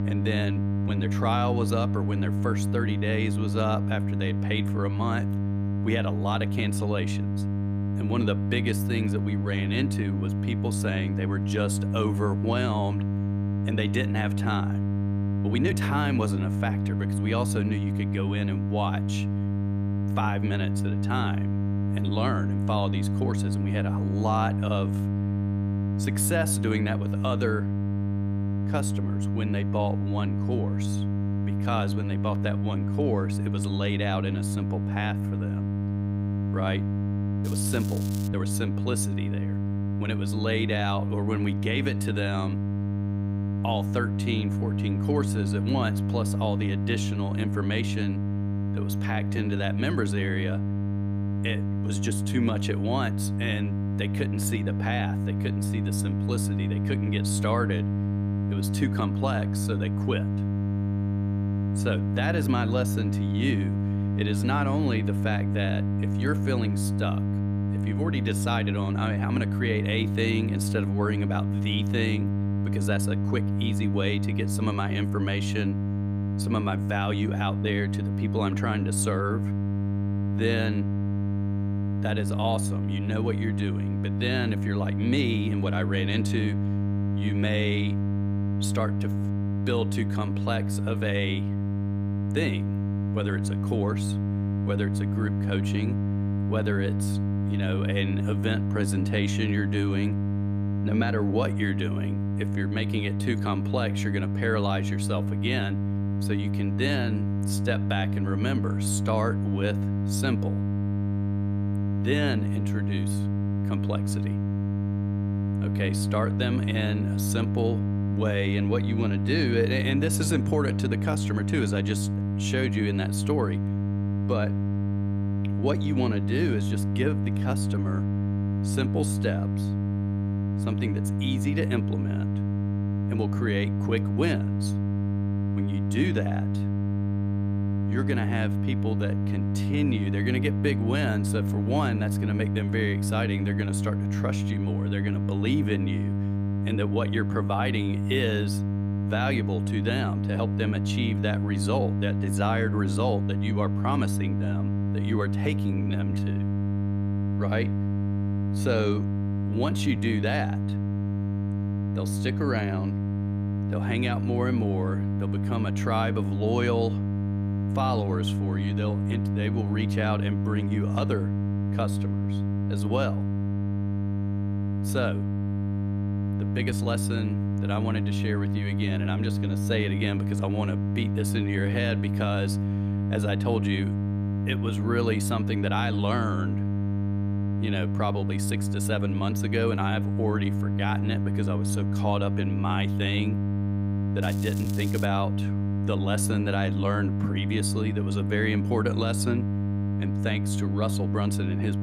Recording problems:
electrical hum; loud; throughout; 50 Hz, 5 dB below the speech
crackling; noticeable; at 37 s and at 3:14; 15 dB below the speech
uneven, jittery; strongly; from 1 s to 3:15

